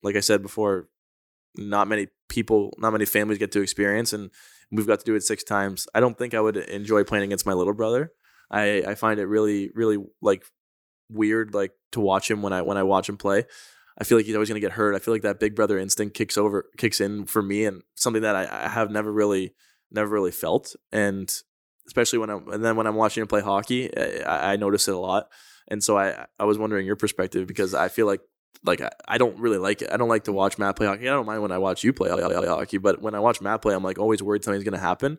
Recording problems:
audio stuttering; at 32 s

